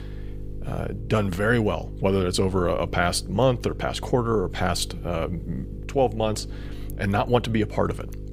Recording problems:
electrical hum; faint; throughout; 50 Hz, 20 dB below the speech

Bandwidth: 15.5 kHz